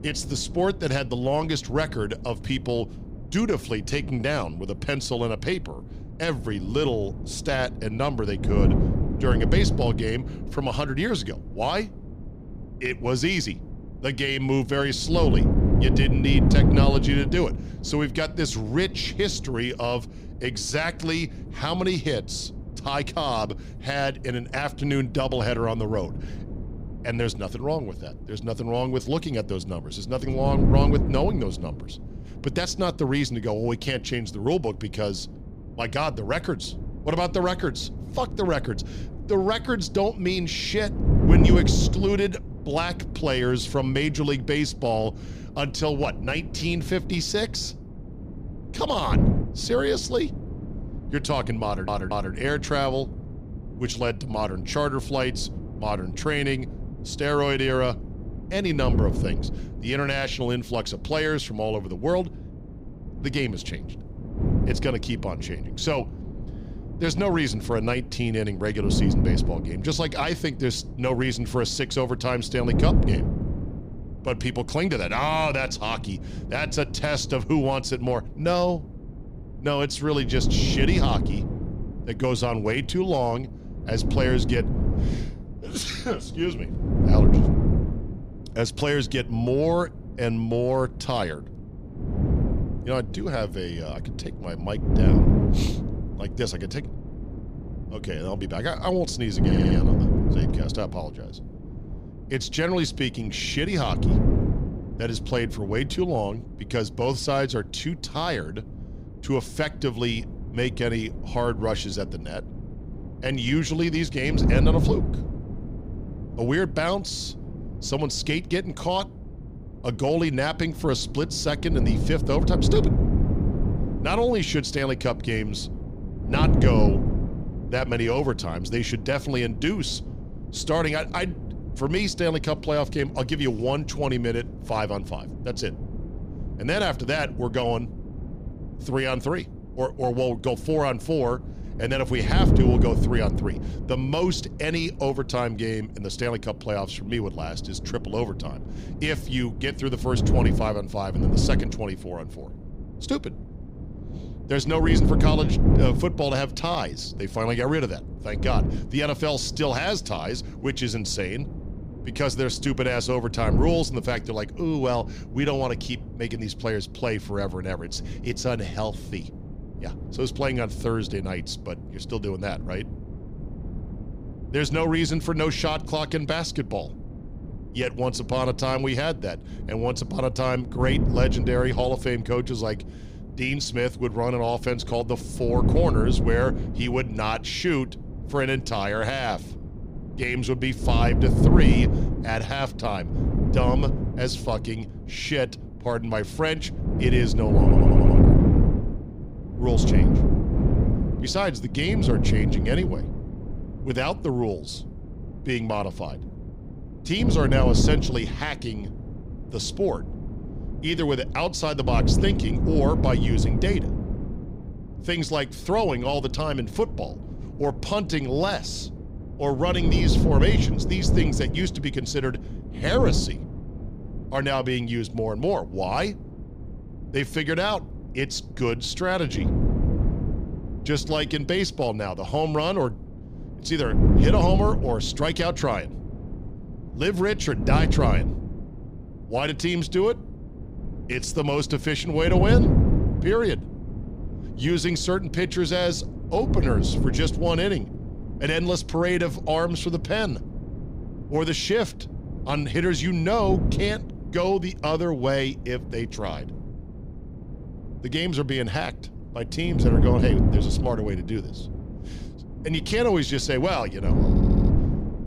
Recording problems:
wind noise on the microphone; heavy; 9 dB below the speech
audio stuttering; 4 times, first at 52 s

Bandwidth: 15.5 kHz